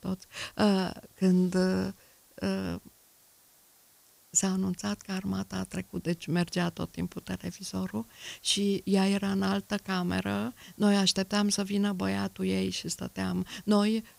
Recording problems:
hiss; faint; throughout; 25 dB below the speech

